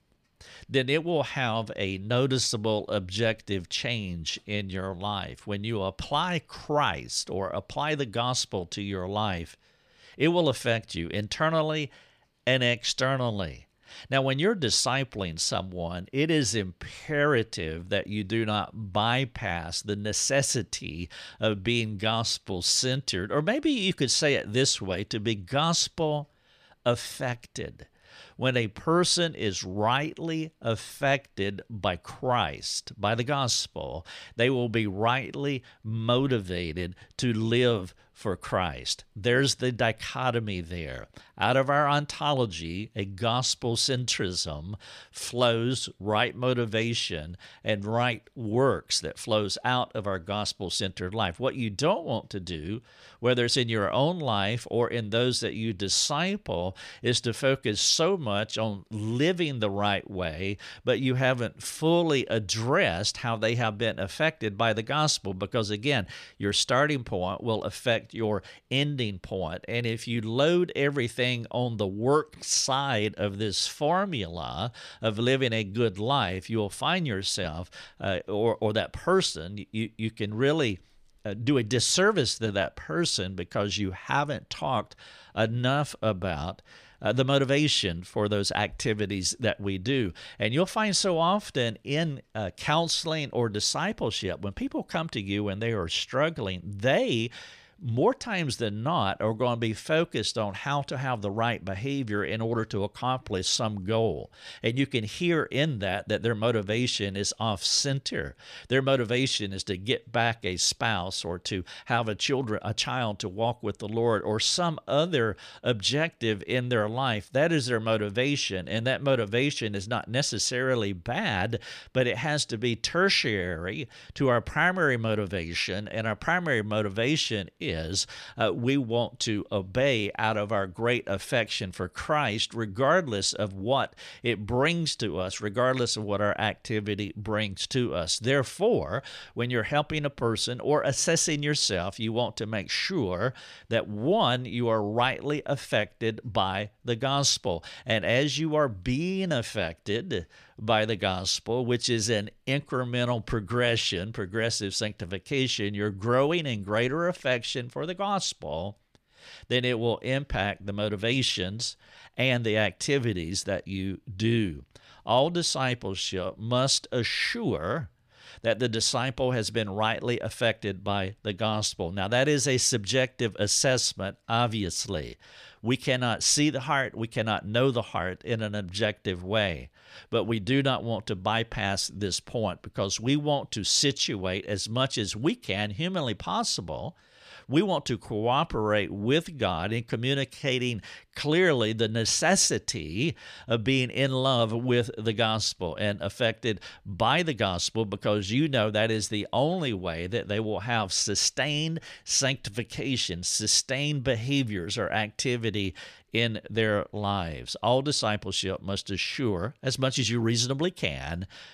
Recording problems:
none

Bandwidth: 14.5 kHz